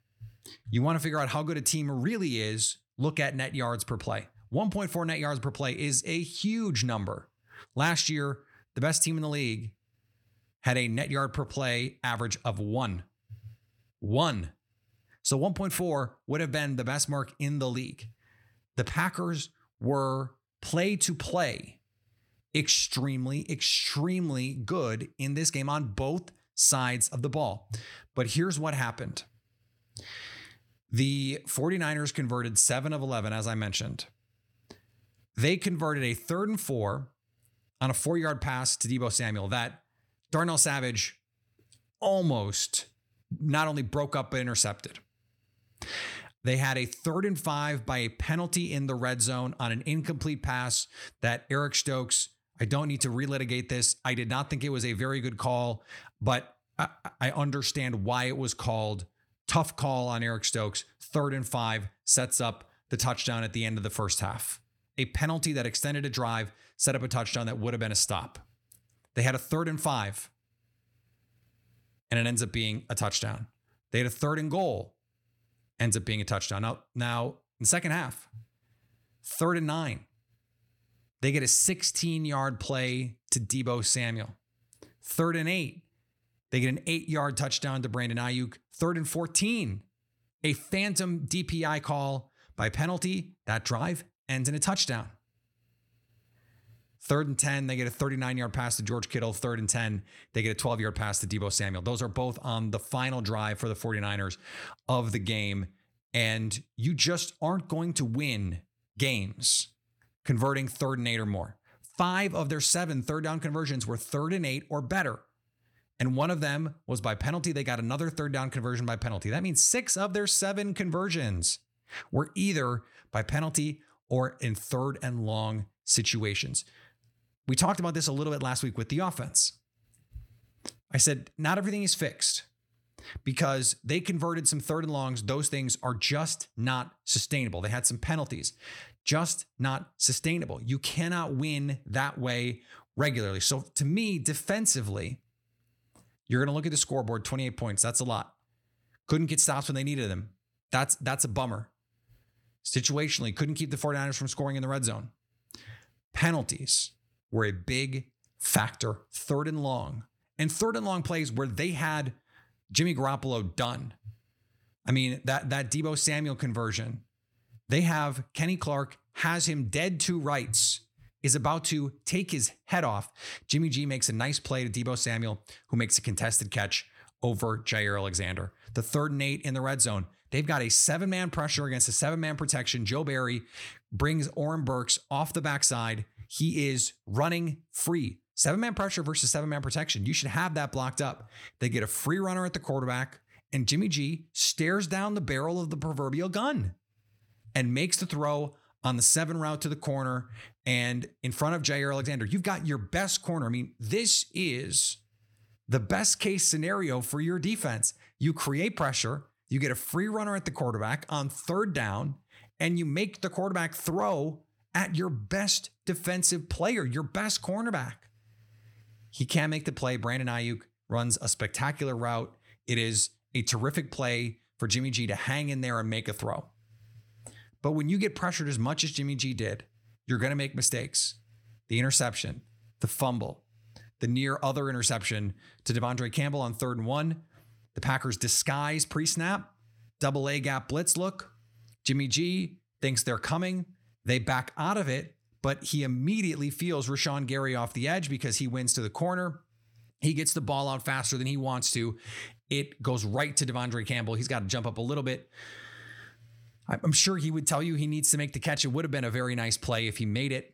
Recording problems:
none

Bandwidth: 17.5 kHz